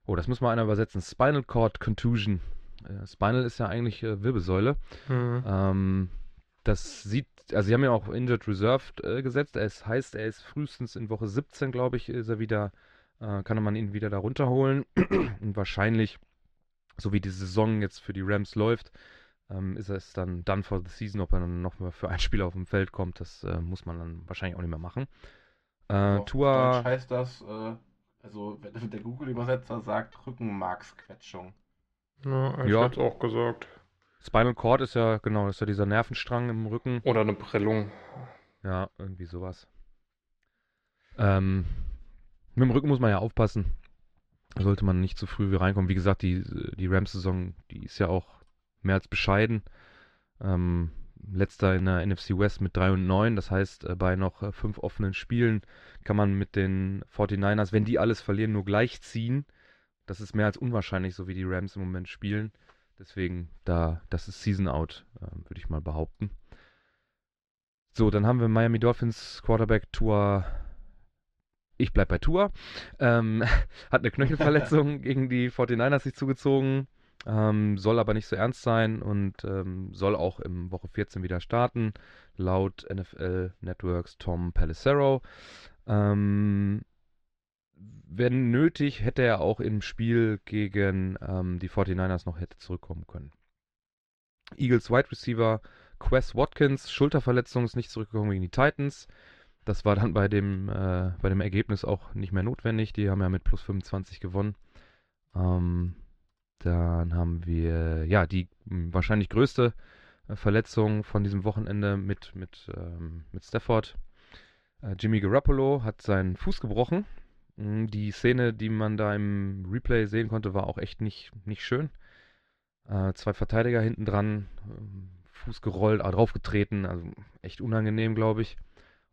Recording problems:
muffled; very slightly; fading above 4.5 kHz

